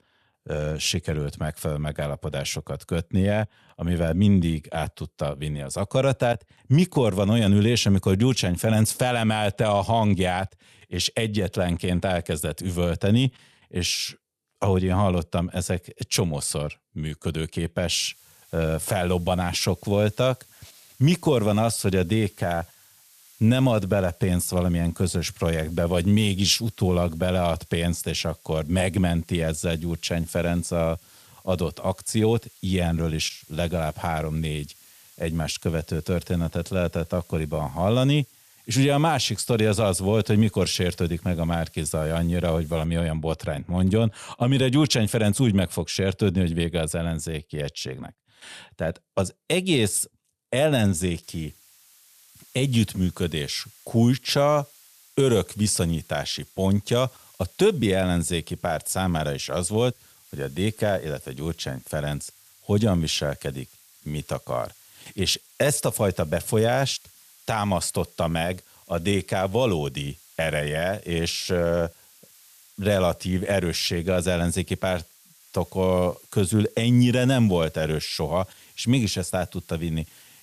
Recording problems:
hiss; faint; from 18 to 43 s and from 51 s on; 25 dB below the speech

